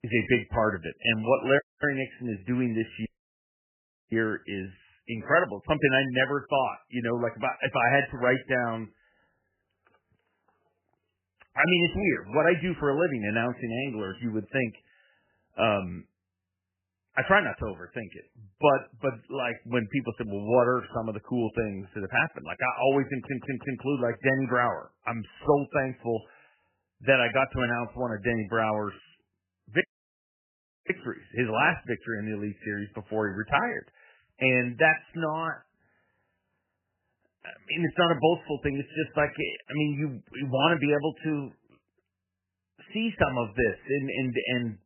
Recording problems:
garbled, watery; badly; nothing above 3 kHz
audio cutting out; at 1.5 s, at 3 s for 1 s and at 30 s for 1 s
audio stuttering; at 23 s

